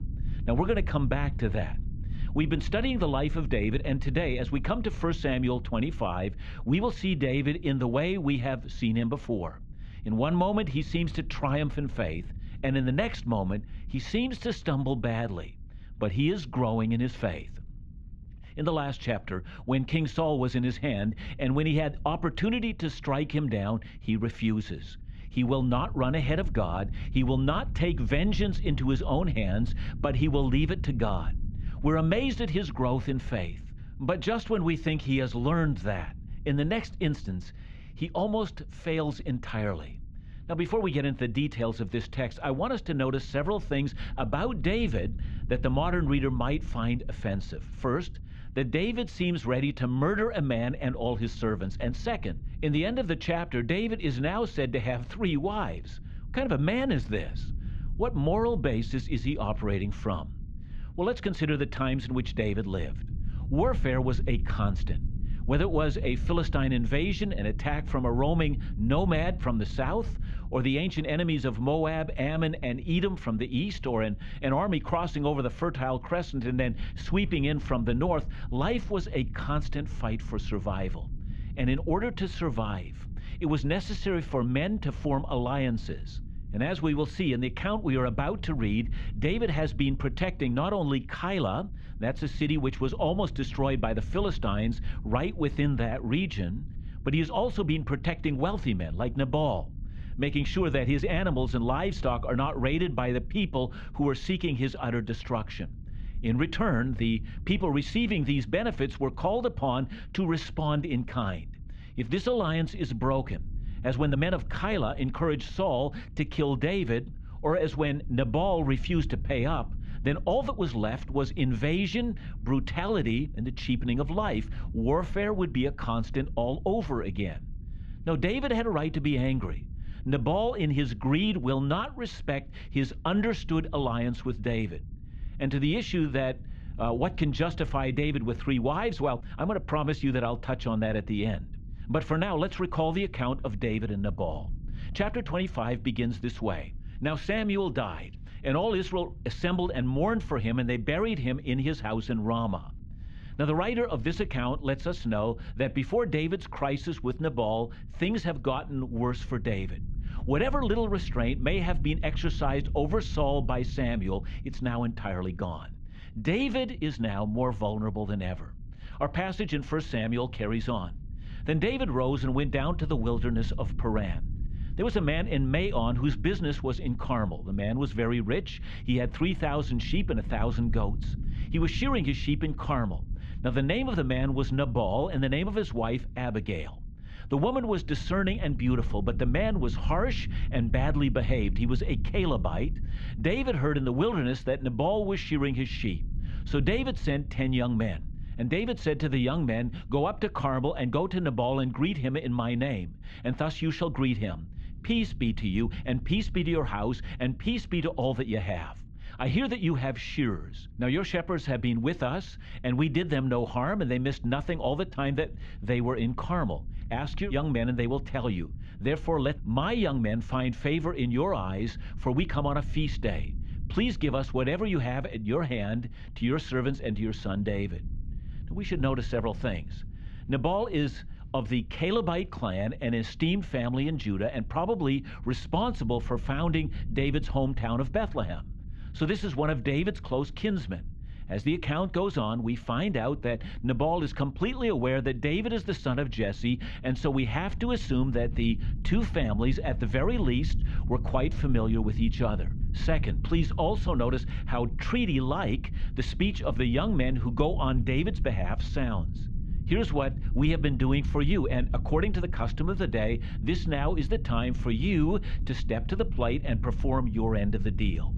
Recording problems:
muffled; slightly; fading above 3.5 kHz
low rumble; faint; throughout; 20 dB below the speech

